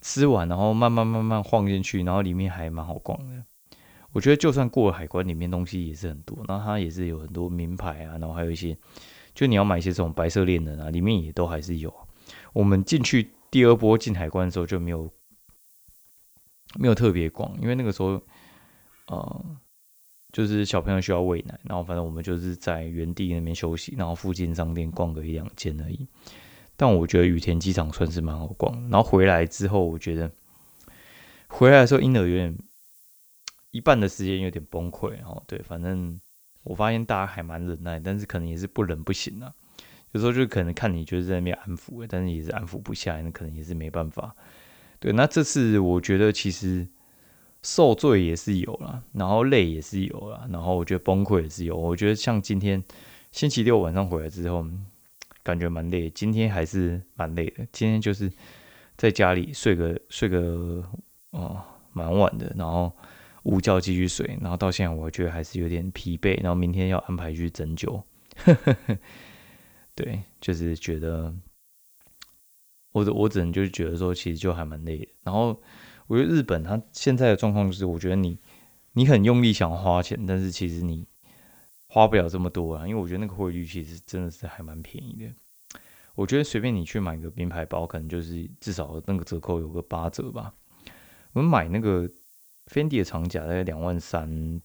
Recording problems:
high frequencies cut off; noticeable; nothing above 8 kHz
hiss; faint; throughout; 30 dB below the speech

